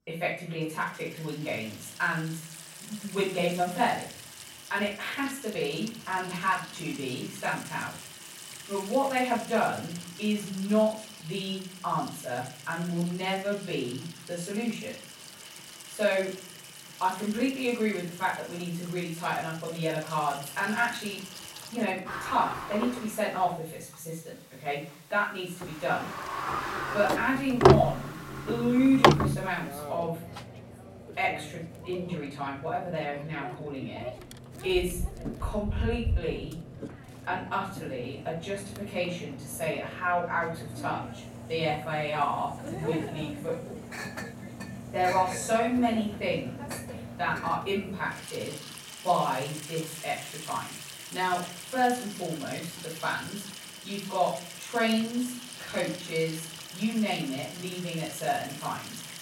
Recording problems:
off-mic speech; far
room echo; noticeable; dies away in 0.5 s
household noises; loud; throughout; 5 dB below the speech

